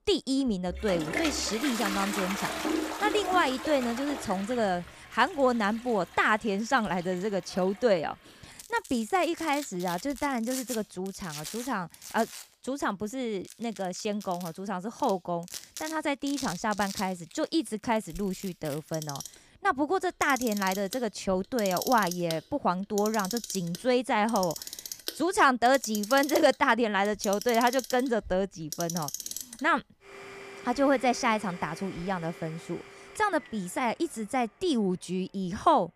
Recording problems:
household noises; loud; throughout; 9 dB below the speech

